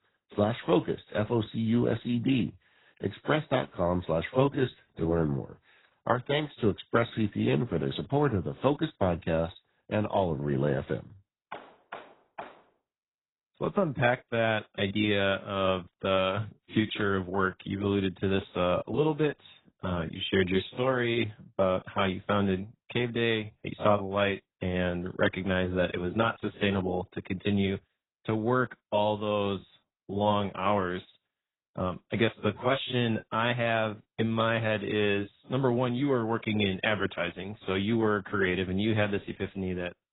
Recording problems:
garbled, watery; badly; nothing above 4 kHz

